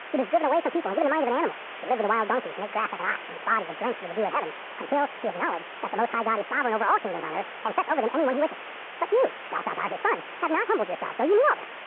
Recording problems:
muffled; very; fading above 4 kHz
wrong speed and pitch; too fast and too high; 1.7 times normal speed
phone-call audio
hiss; noticeable; throughout; 10 dB below the speech

